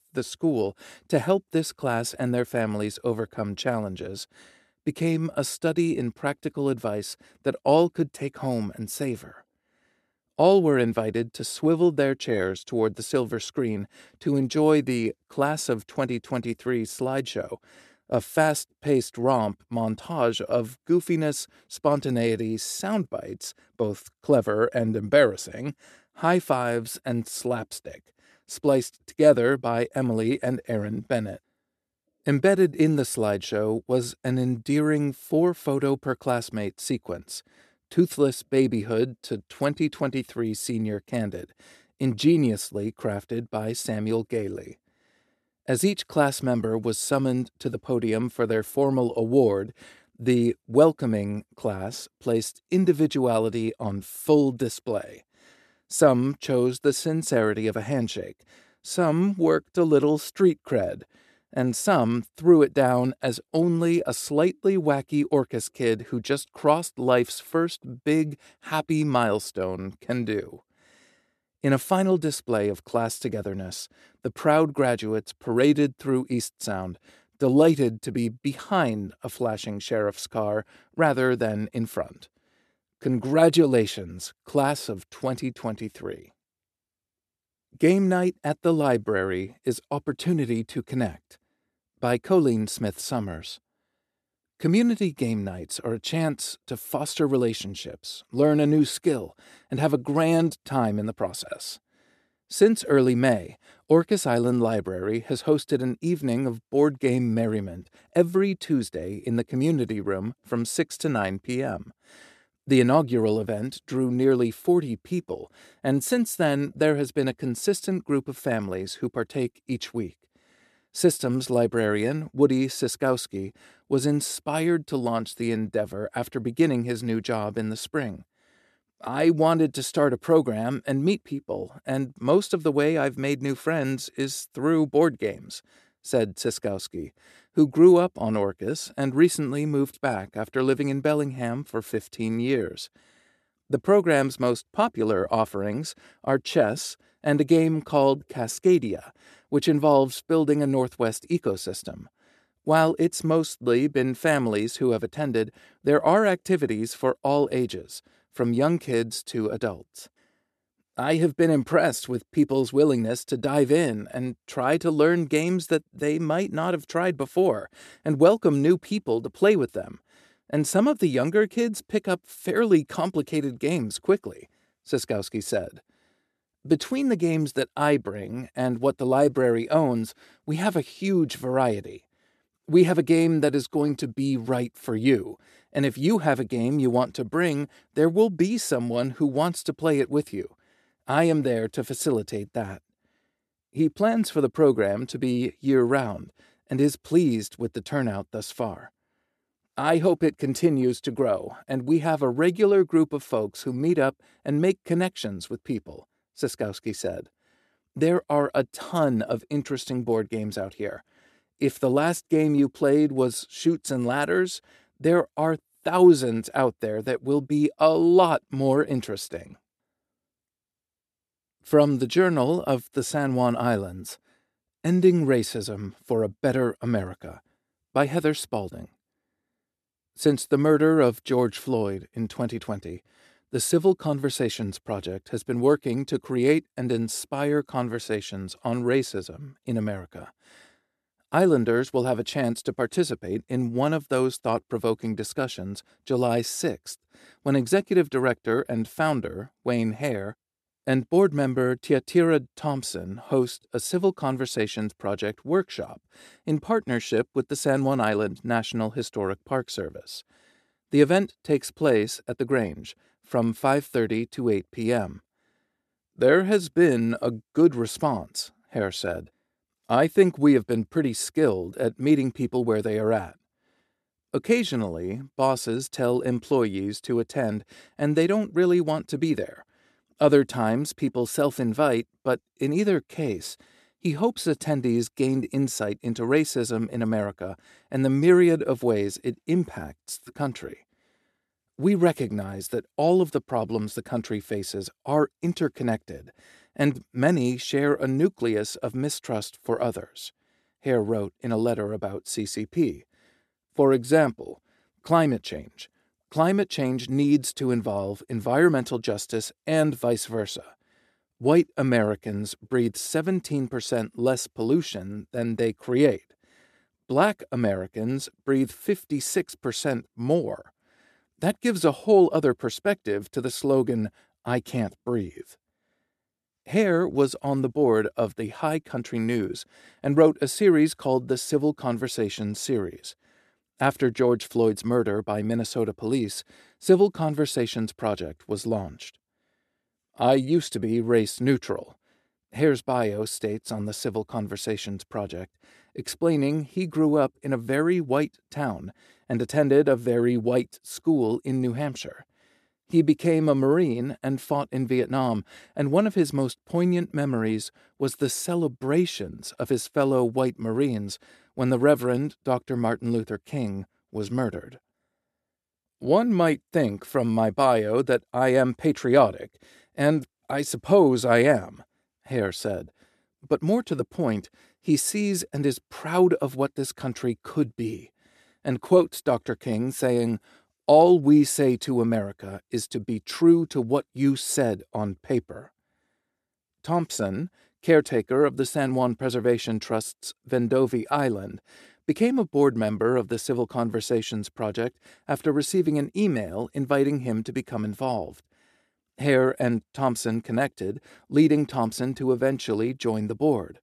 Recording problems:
none

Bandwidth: 13.5 kHz